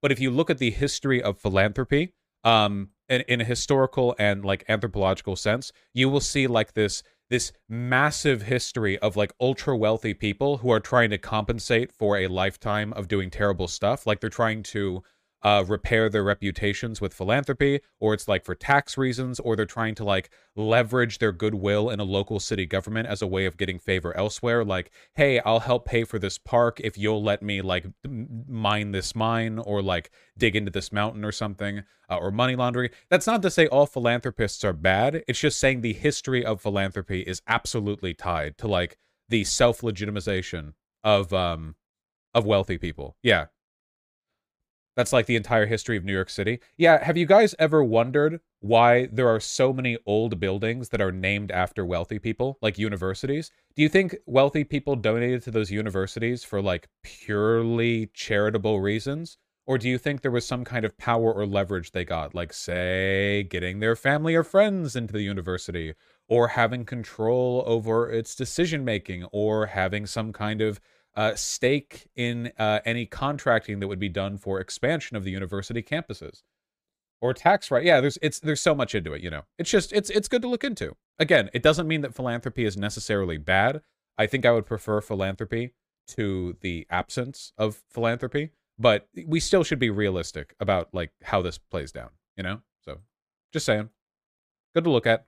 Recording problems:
none

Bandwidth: 15 kHz